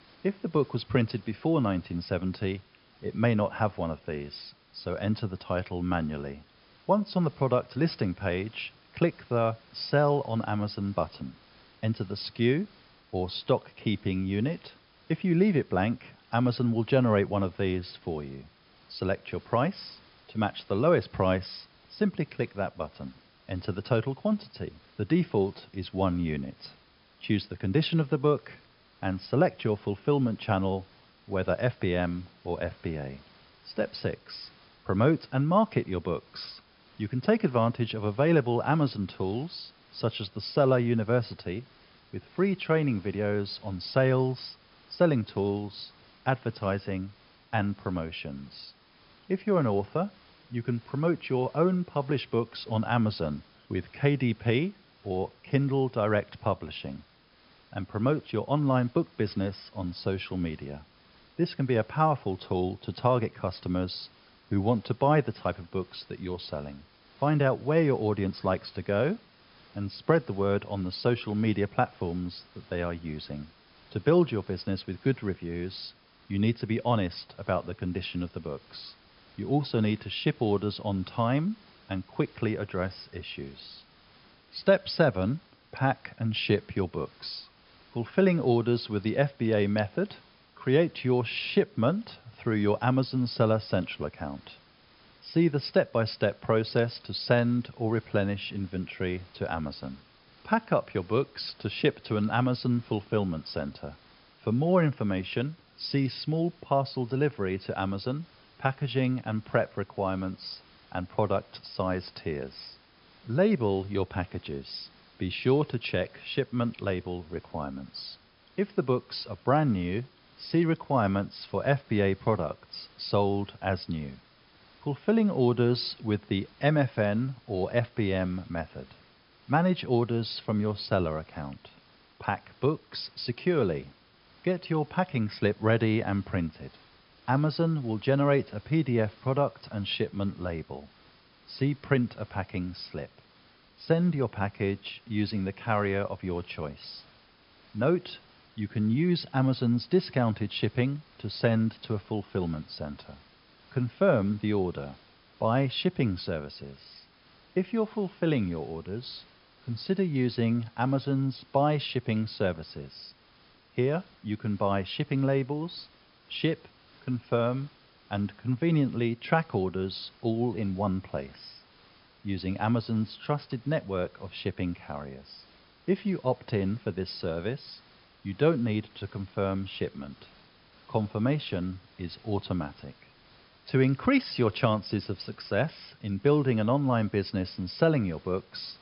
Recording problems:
high frequencies cut off; noticeable; nothing above 5.5 kHz
hiss; faint; throughout; 30 dB below the speech

